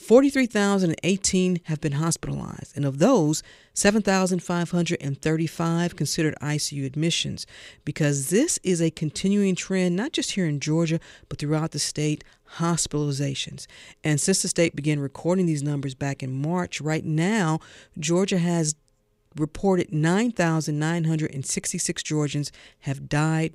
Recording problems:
none

